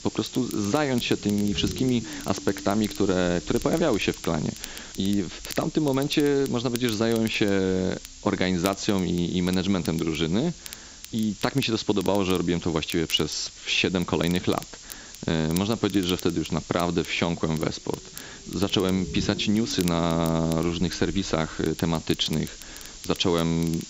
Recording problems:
high frequencies cut off; noticeable; nothing above 8 kHz
hiss; noticeable; throughout; 15 dB below the speech
low rumble; noticeable; throughout; 20 dB below the speech
crackle, like an old record; noticeable; 20 dB below the speech

